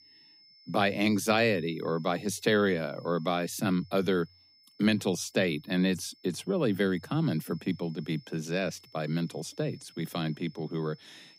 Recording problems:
high-pitched whine; faint; throughout; 5 kHz, 25 dB below the speech

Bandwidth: 15.5 kHz